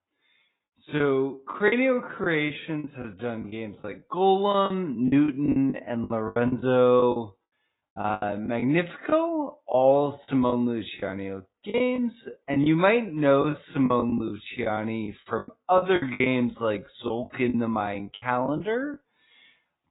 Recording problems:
garbled, watery; badly
high frequencies cut off; severe; nothing above 4 kHz
wrong speed, natural pitch; too slow; 0.6 times normal speed
choppy; very; 11% of the speech affected

